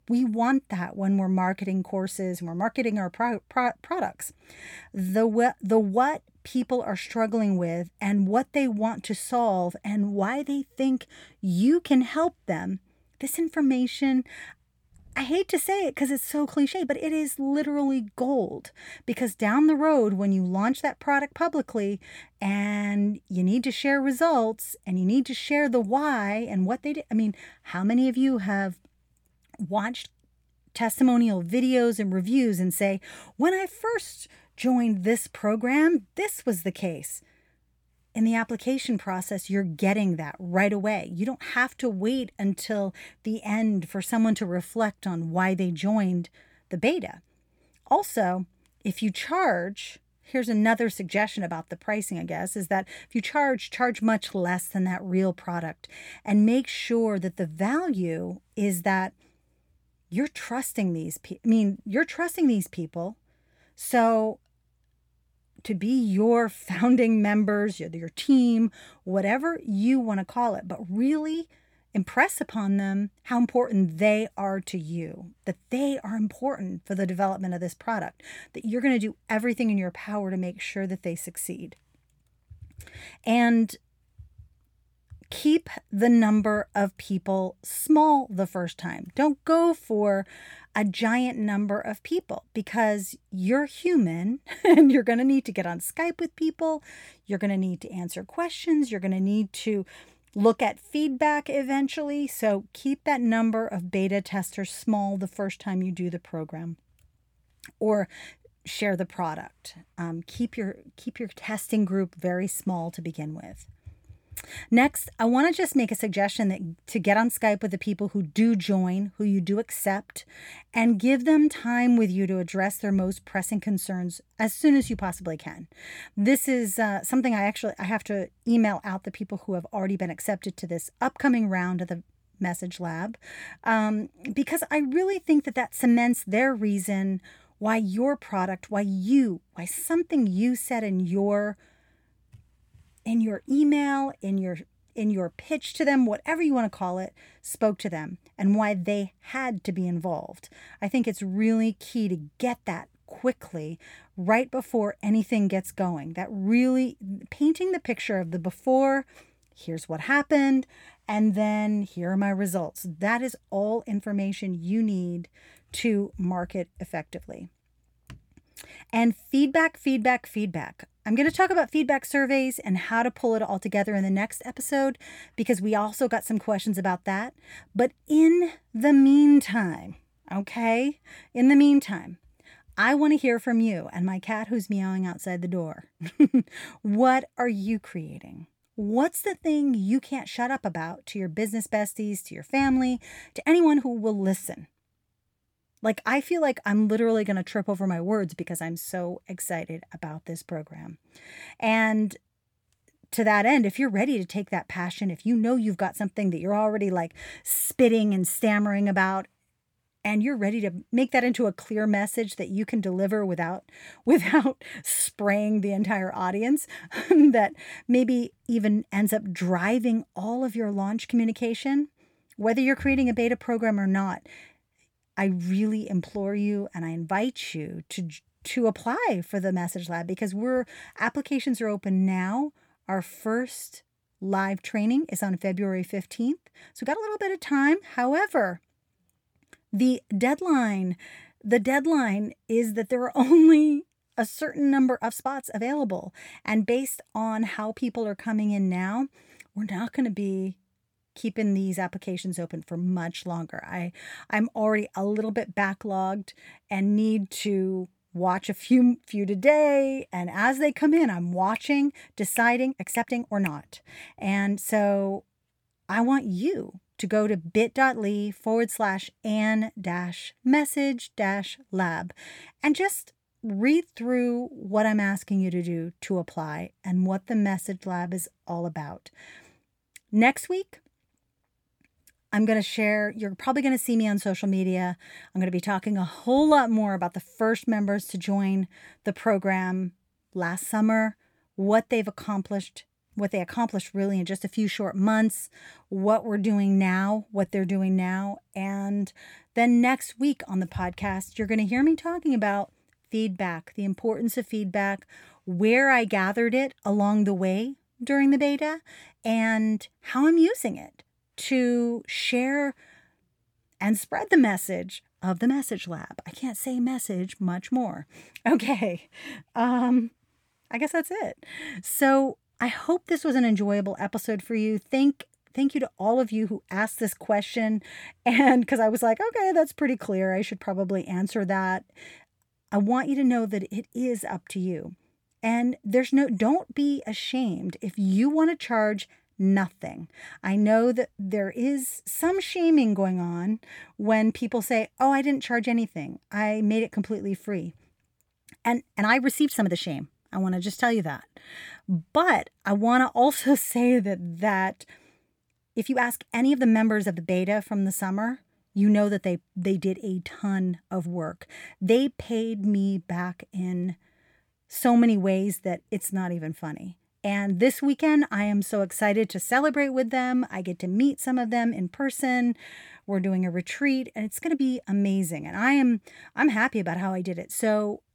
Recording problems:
uneven, jittery; strongly; from 16 s to 6:15

